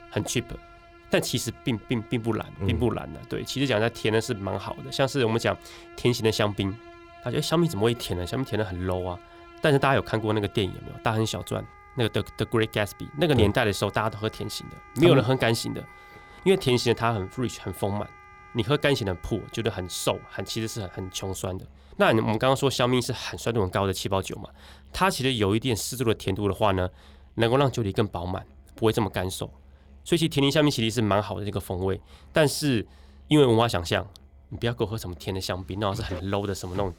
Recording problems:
background music; faint; throughout; 25 dB below the speech

